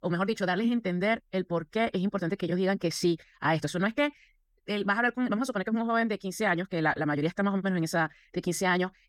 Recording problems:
wrong speed, natural pitch; too fast; 1.5 times normal speed

